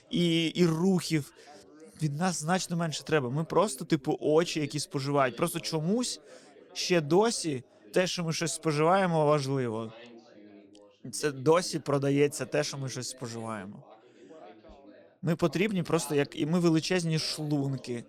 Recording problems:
background chatter; faint; throughout; 3 voices, 25 dB below the speech

